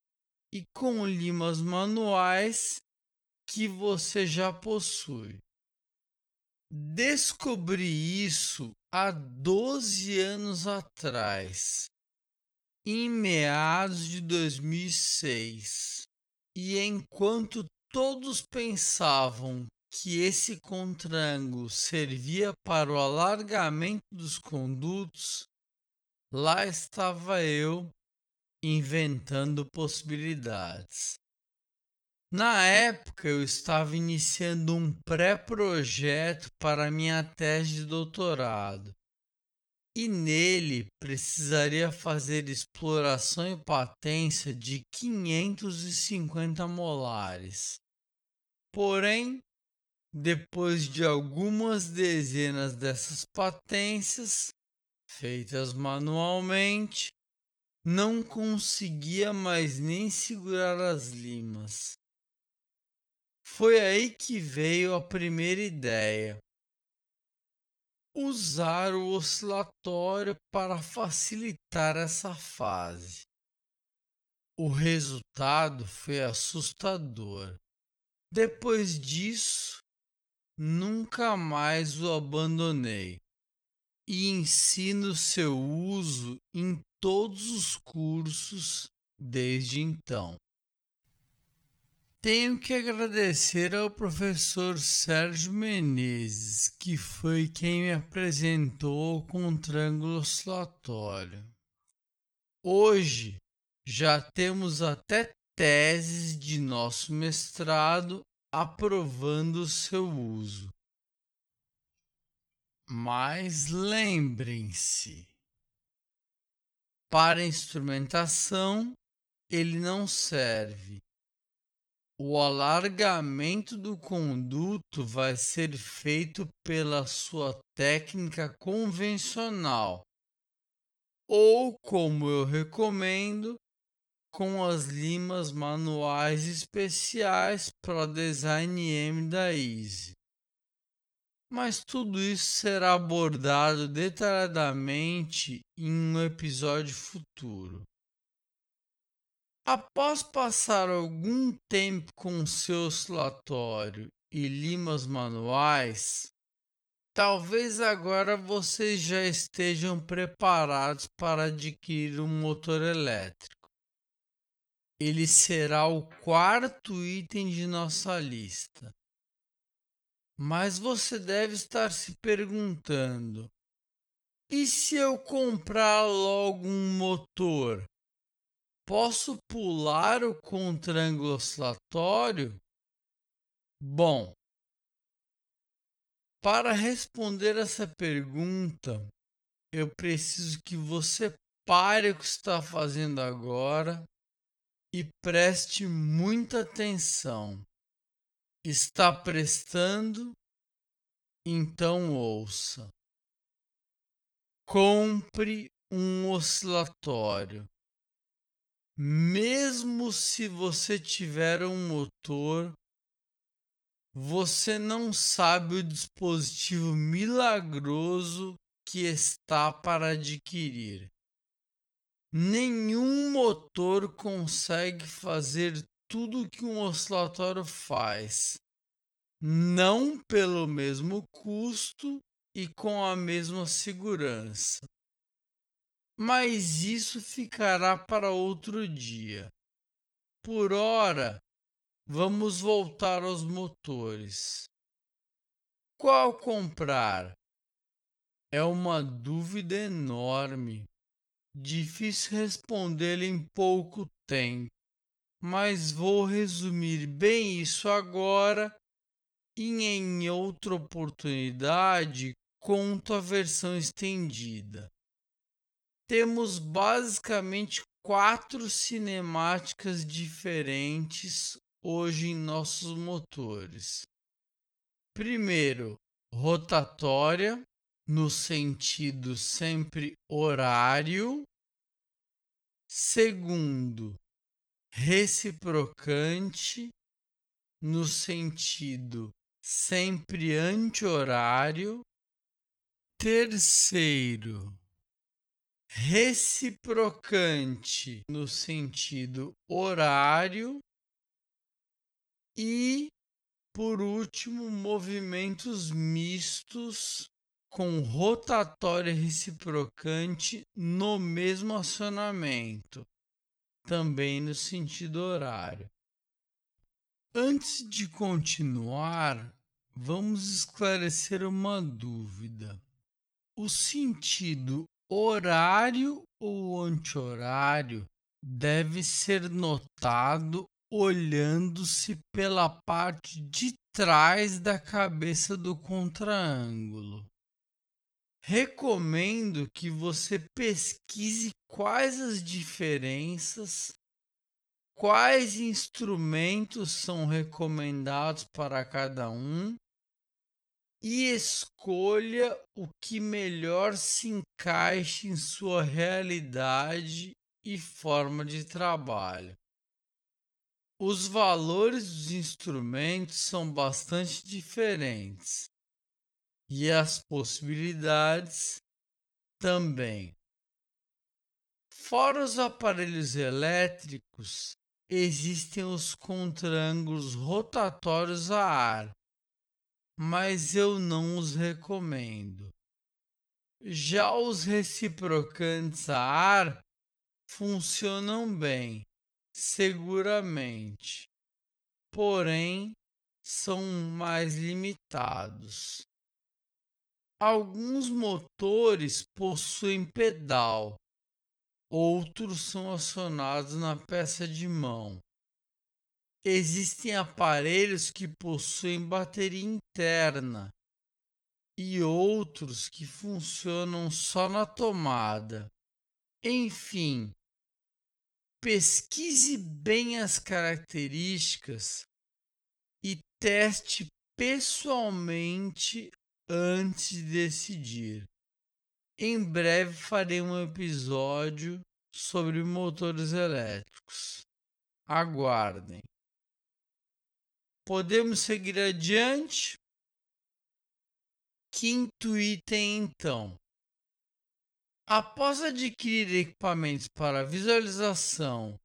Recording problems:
wrong speed, natural pitch; too slow; 0.5 times normal speed

